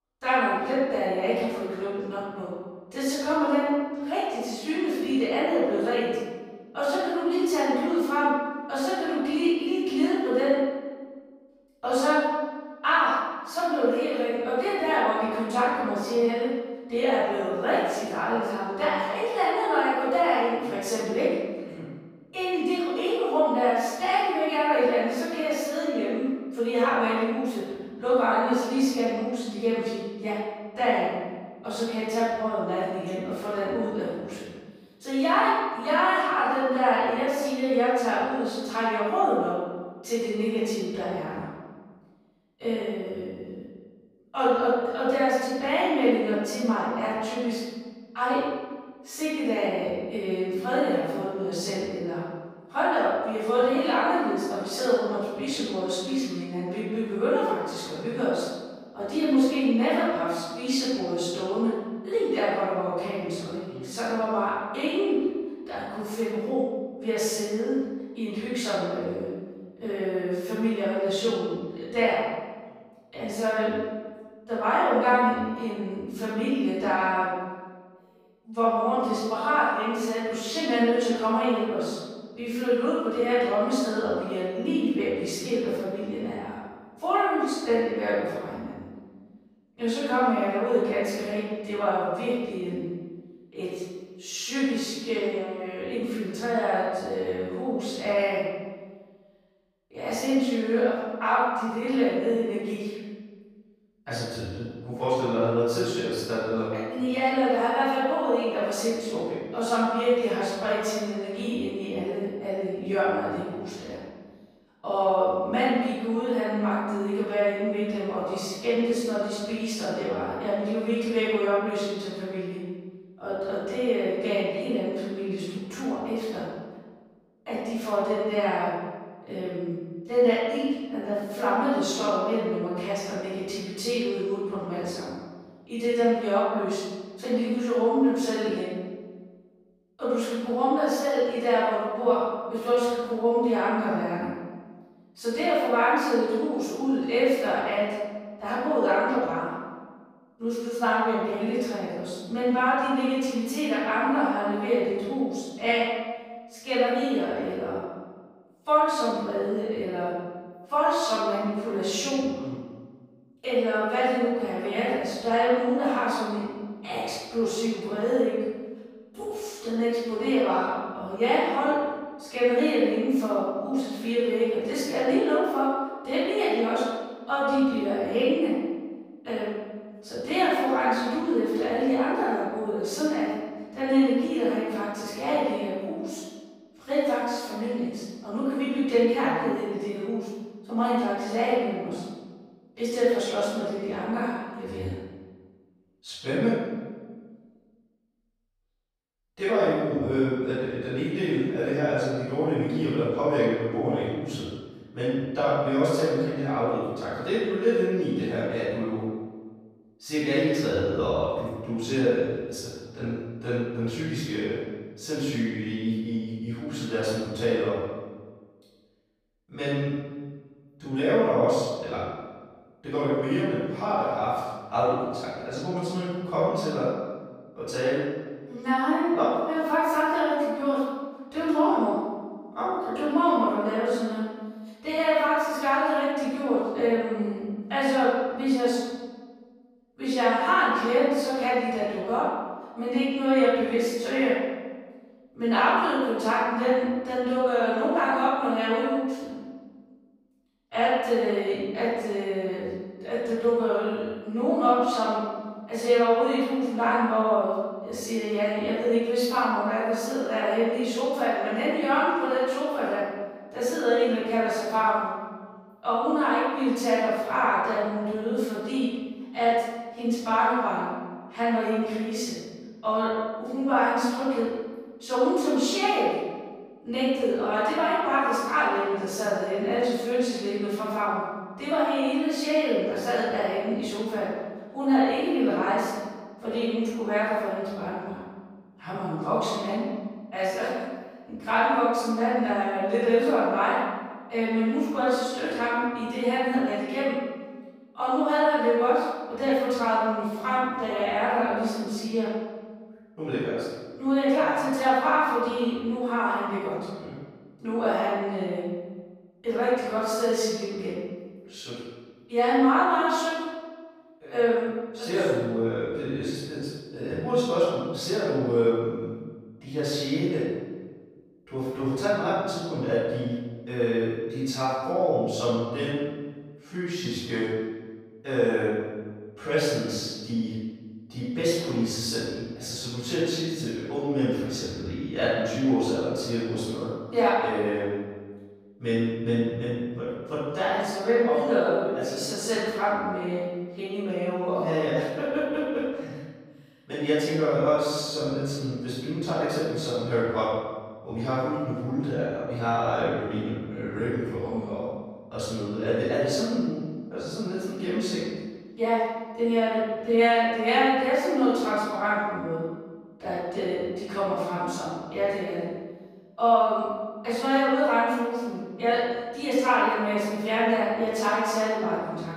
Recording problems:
room echo; strong; dies away in 1.3 s
off-mic speech; far

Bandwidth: 15.5 kHz